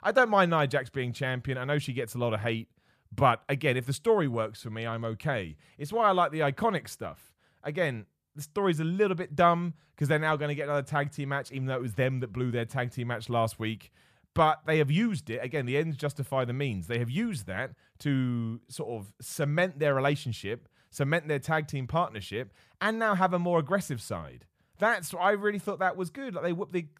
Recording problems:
none

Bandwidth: 14.5 kHz